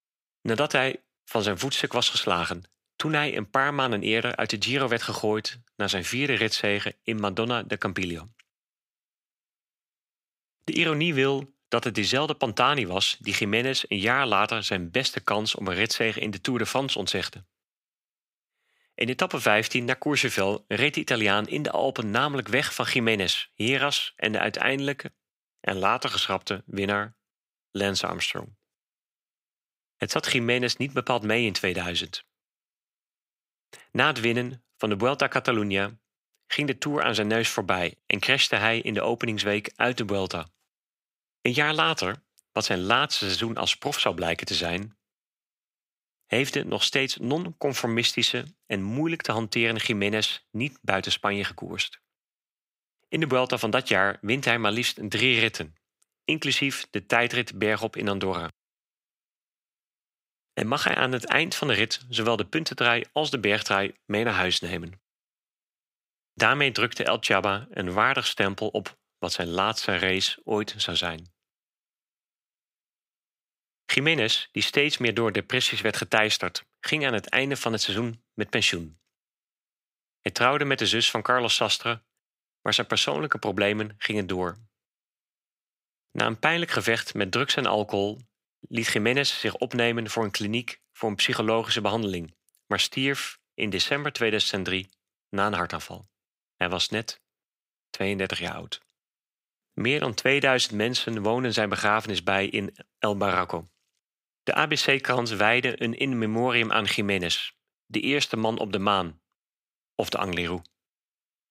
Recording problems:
thin; somewhat; fading below 700 Hz

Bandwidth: 15.5 kHz